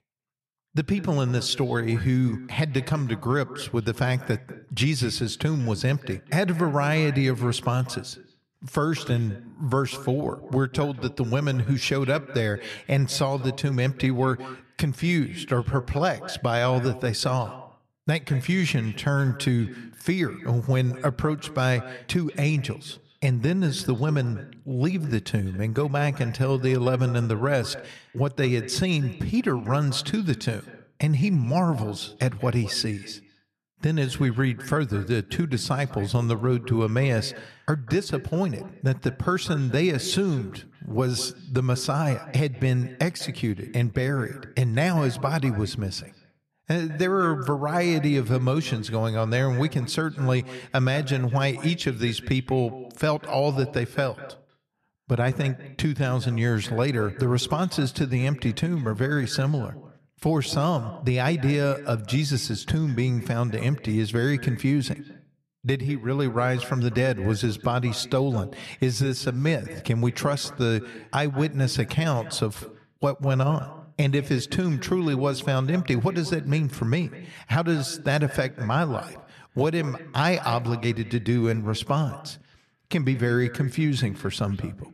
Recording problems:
echo of what is said; noticeable; throughout; 200 ms later, 15 dB below the speech

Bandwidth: 13.5 kHz